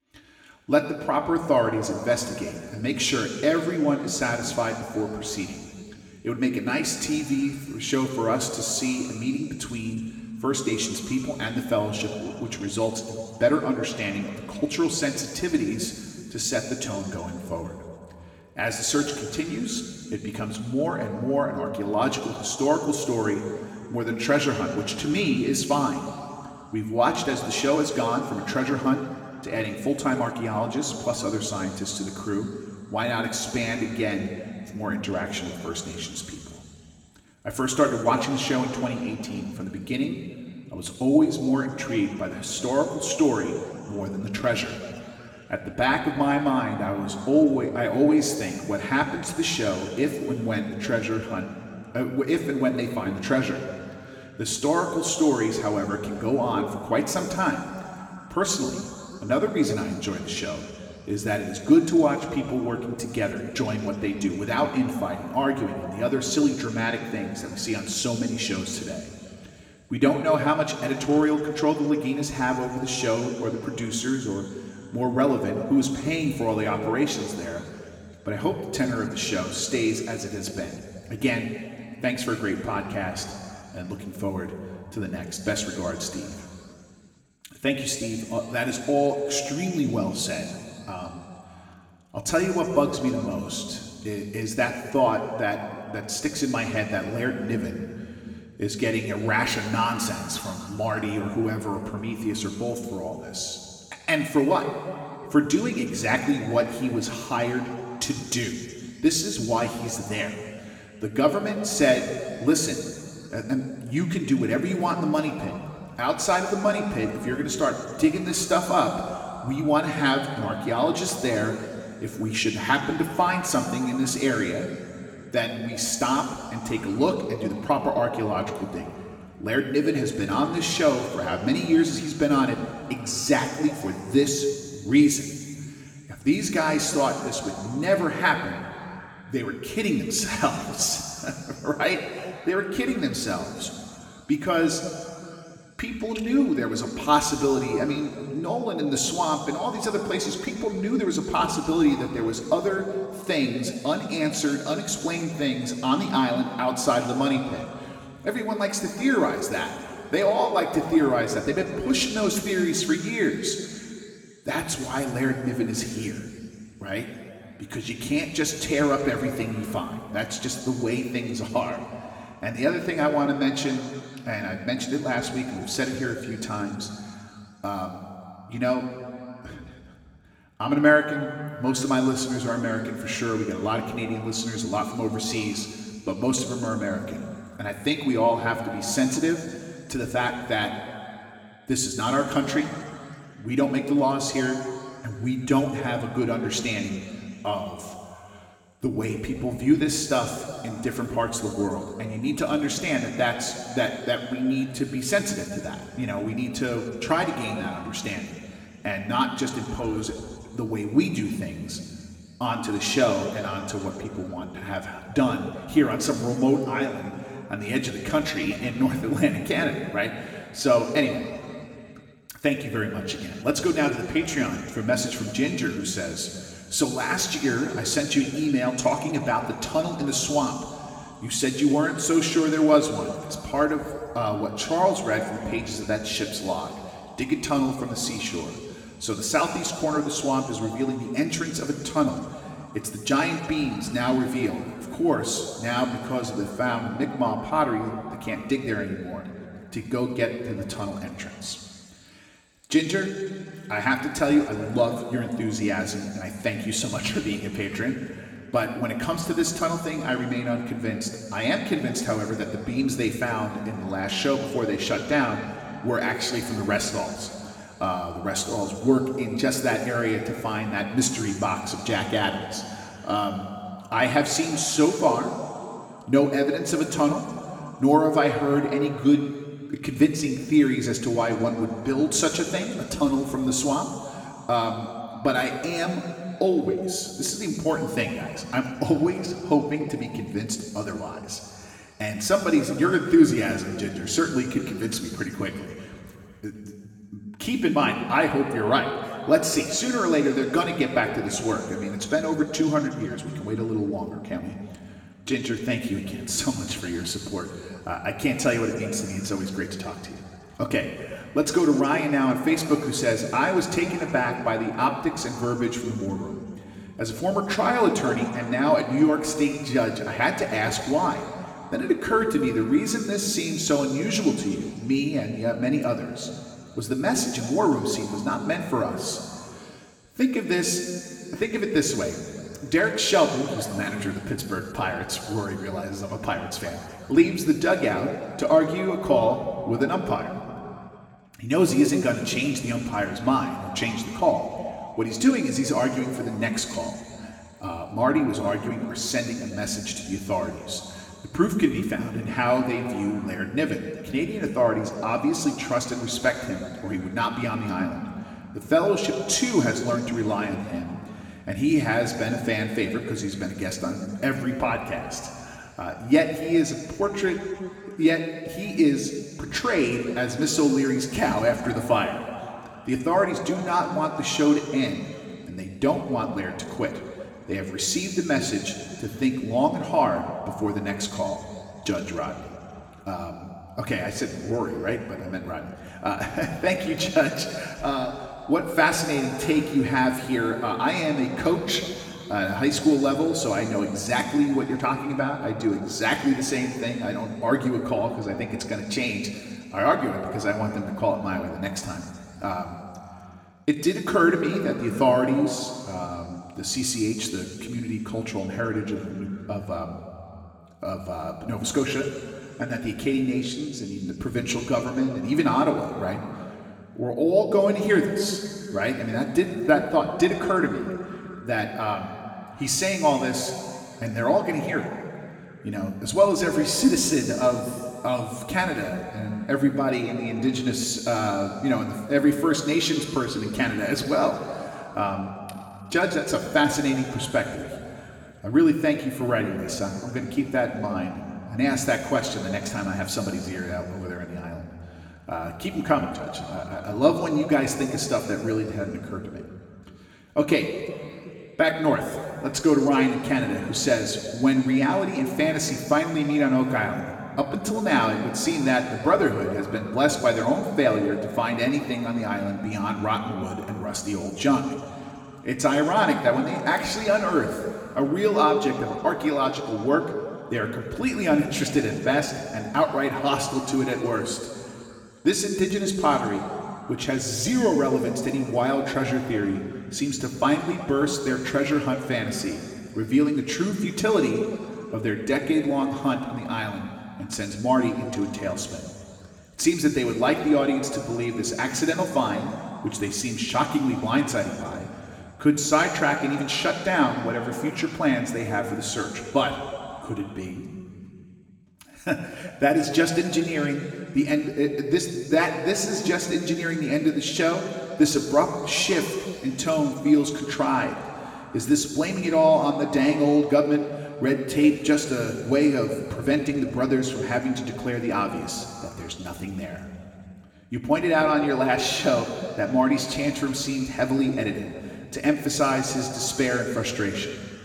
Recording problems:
room echo; slight; dies away in 2.4 s
off-mic speech; somewhat distant

